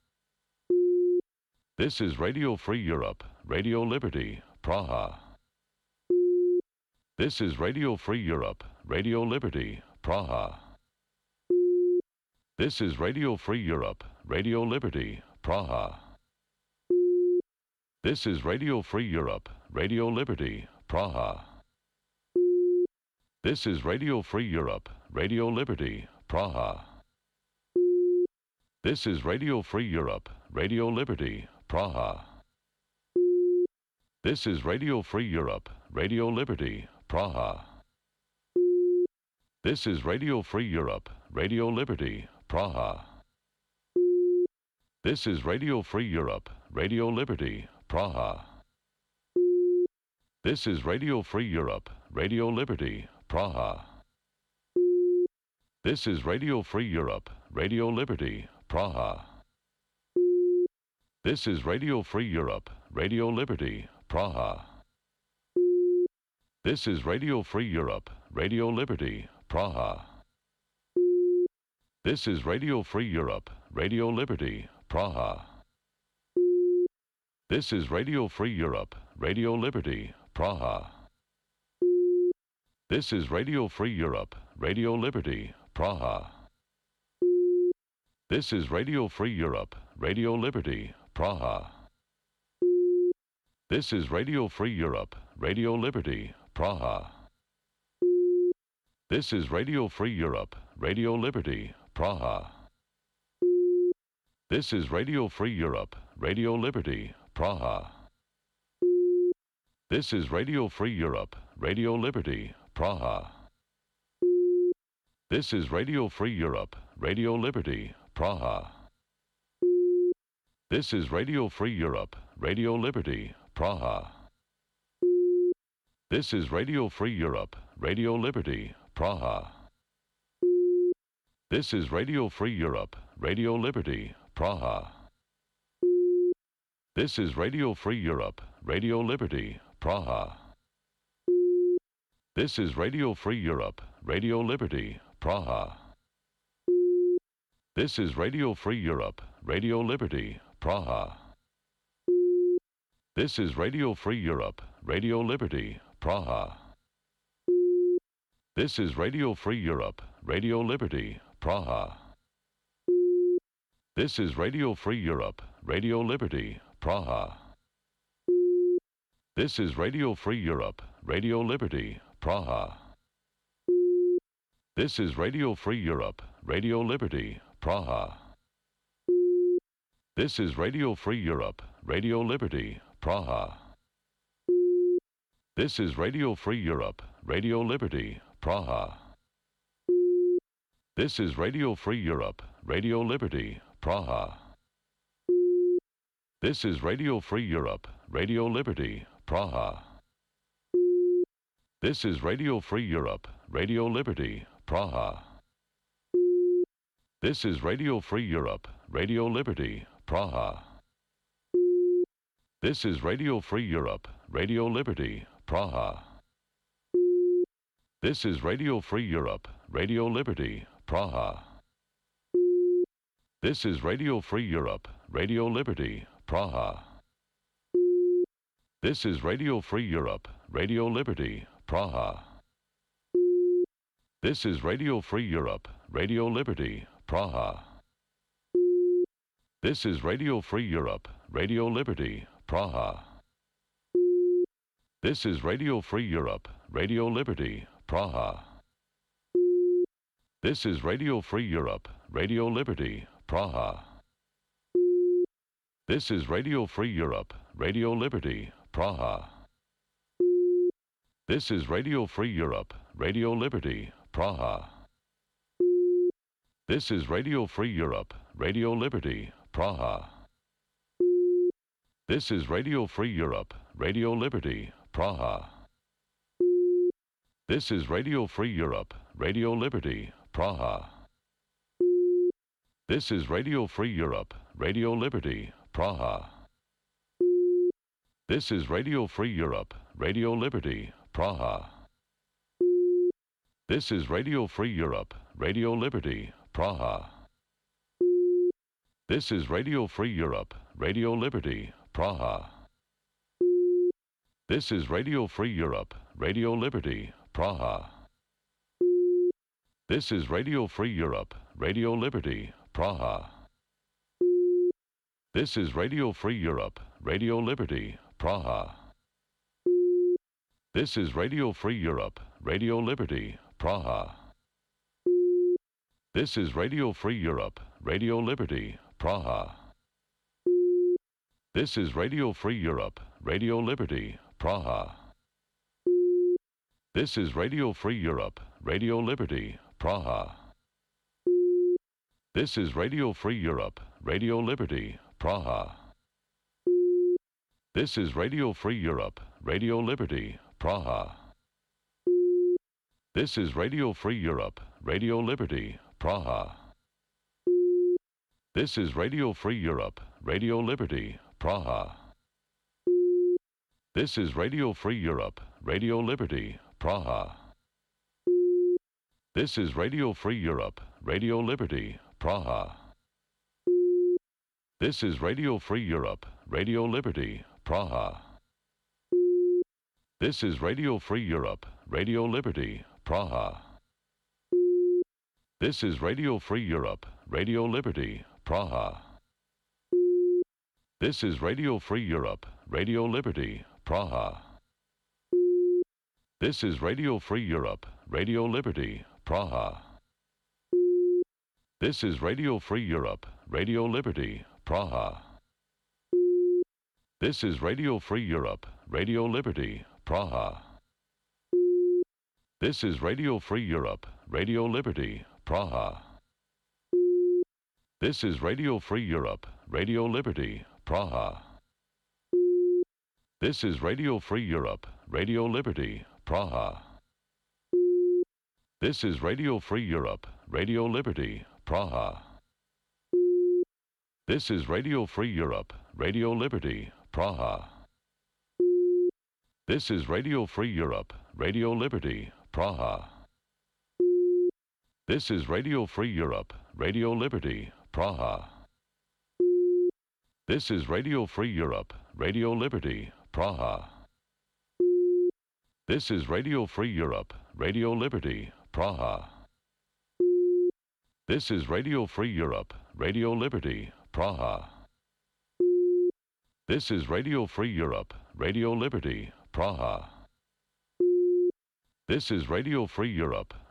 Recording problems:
none

